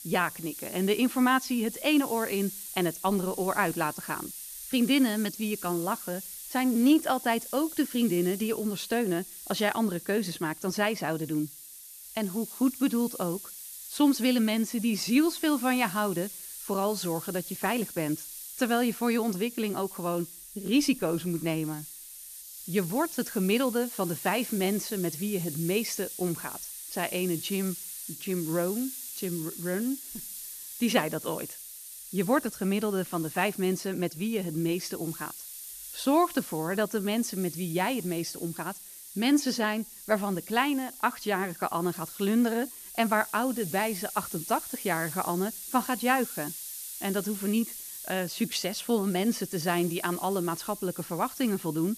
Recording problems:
hiss; noticeable; throughout; 10 dB below the speech

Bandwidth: 14.5 kHz